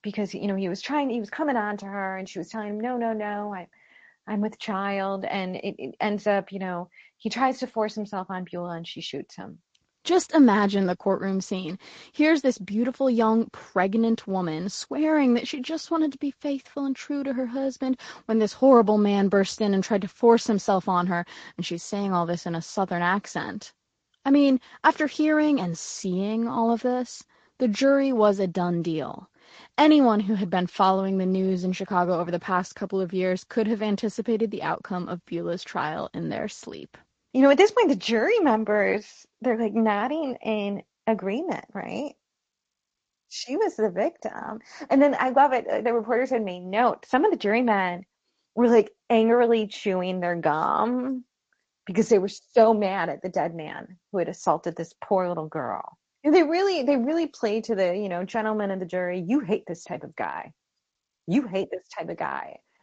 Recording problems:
garbled, watery; slightly; nothing above 7.5 kHz

